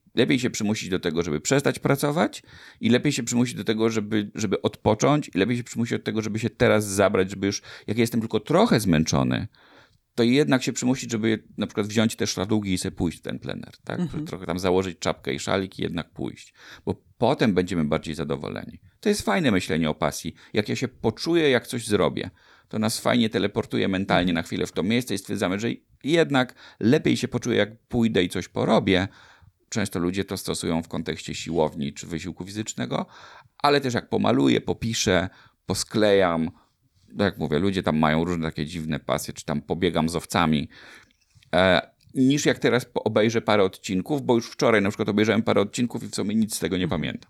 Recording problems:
none

